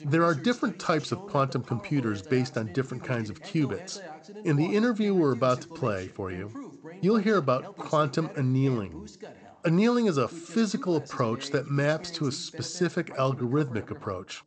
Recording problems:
garbled, watery; slightly; nothing above 8 kHz
voice in the background; noticeable; throughout; 15 dB below the speech

